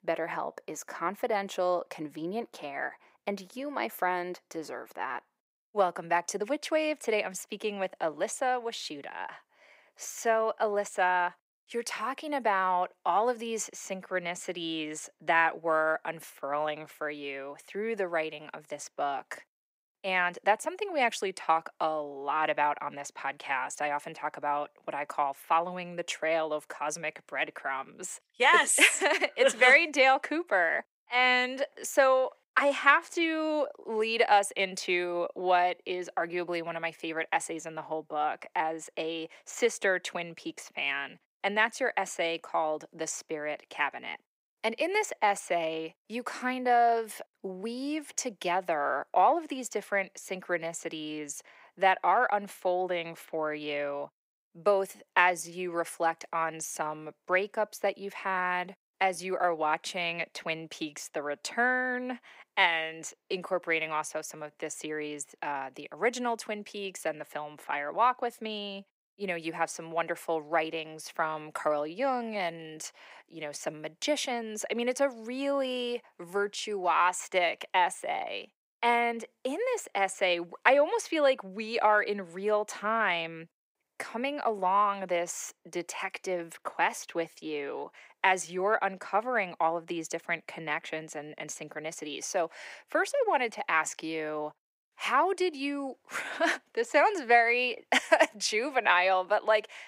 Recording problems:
thin; somewhat; fading below 500 Hz

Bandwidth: 15.5 kHz